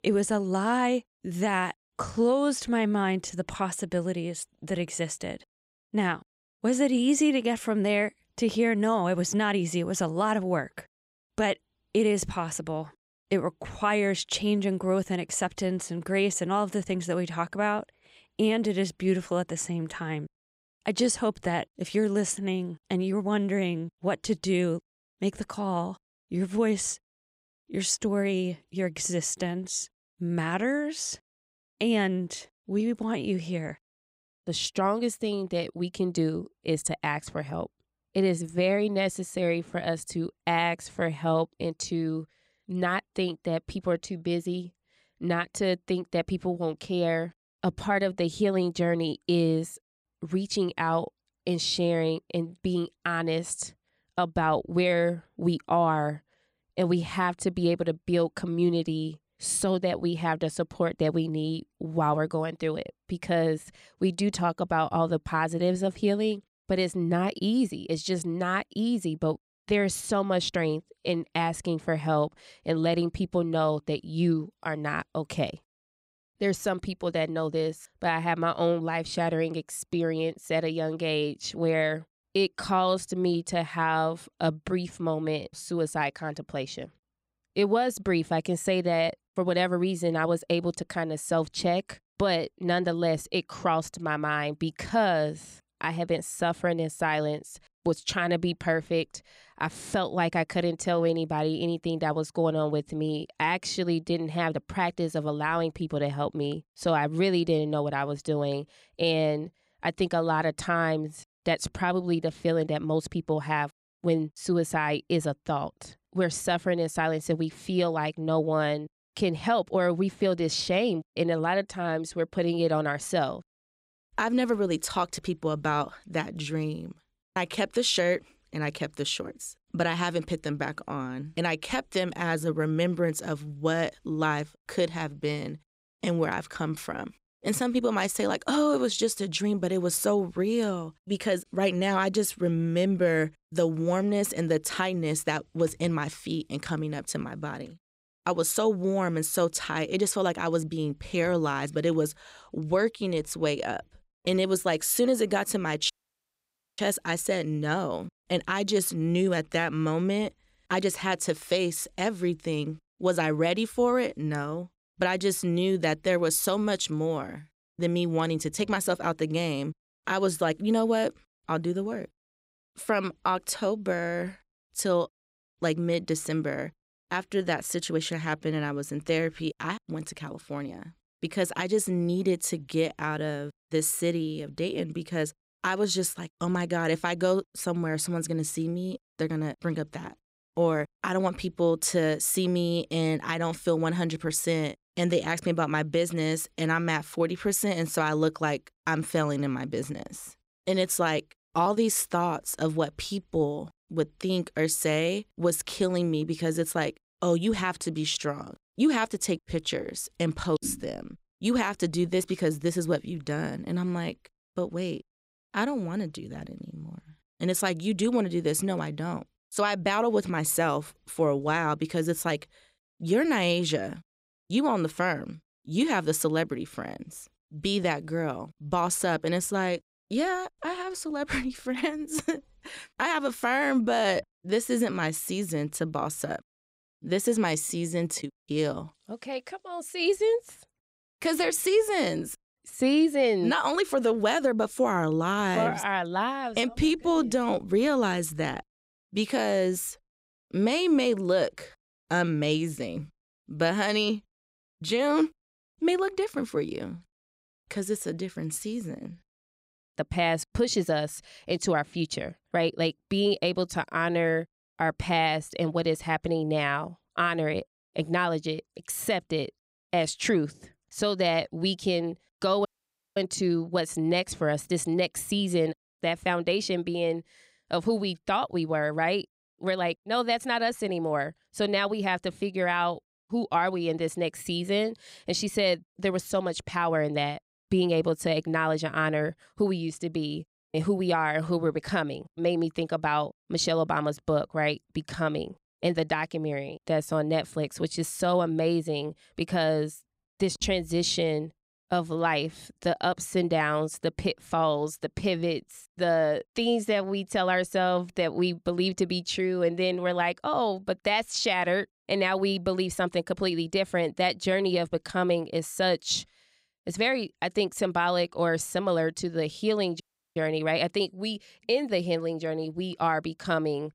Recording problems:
audio cutting out; at 2:36 for 1 s, at 4:33 for 0.5 s and at 5:20

